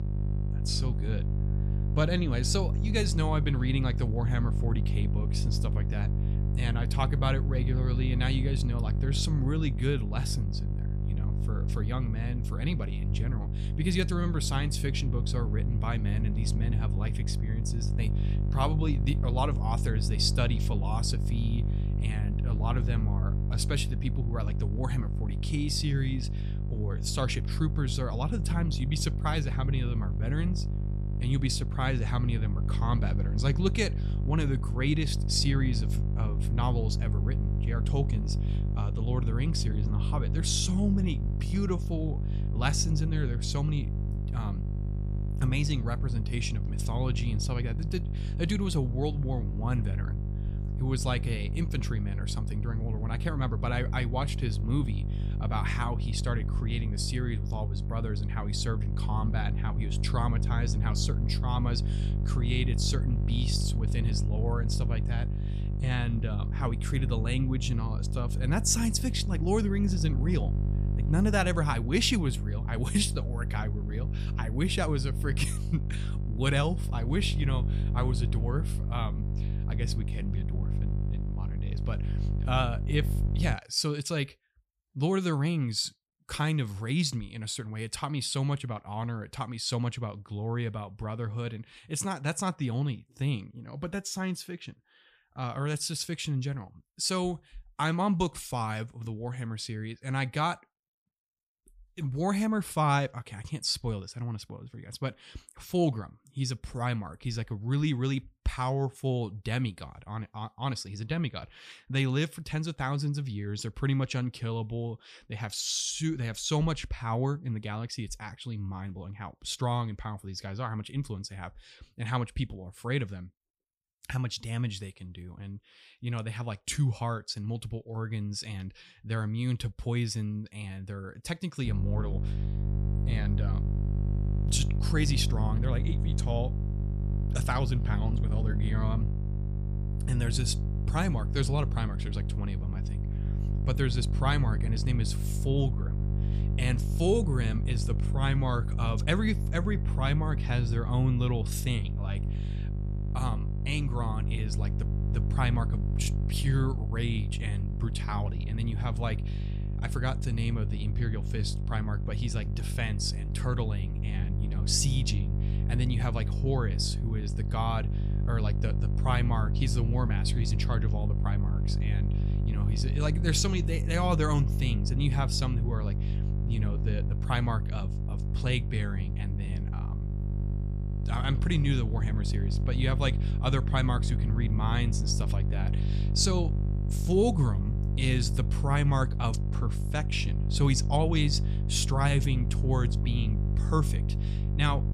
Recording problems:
electrical hum; loud; until 1:24 and from 2:12 on; 50 Hz, 9 dB below the speech

